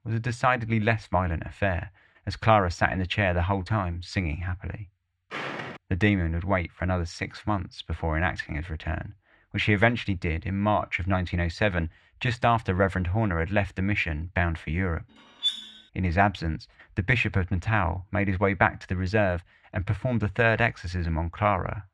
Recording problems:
muffled; slightly; fading above 2.5 kHz
footsteps; noticeable; at 5.5 s; peak 7 dB below the speech
clattering dishes; noticeable; at 15 s; peak 1 dB below the speech

